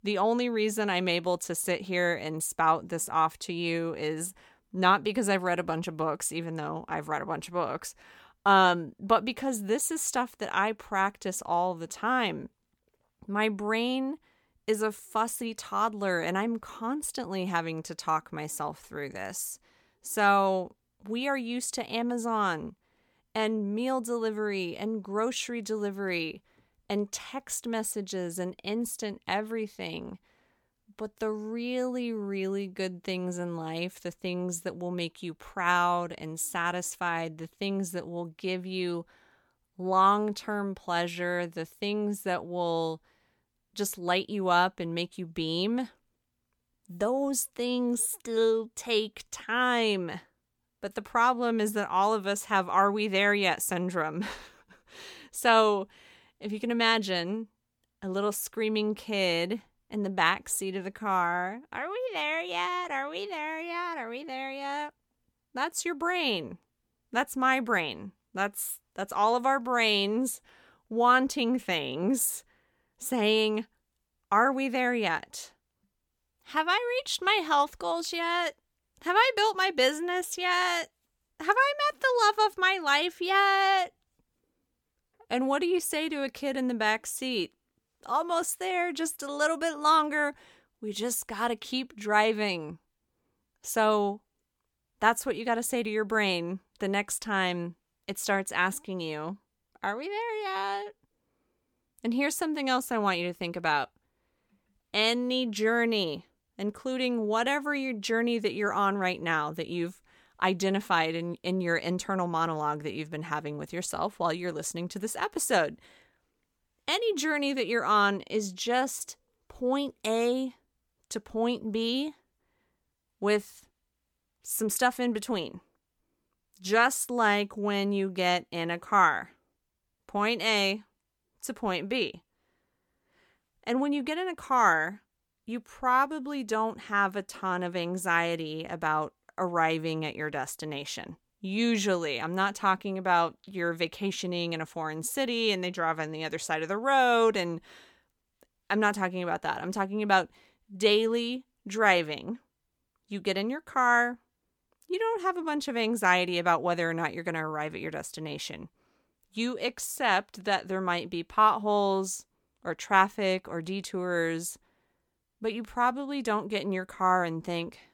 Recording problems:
none

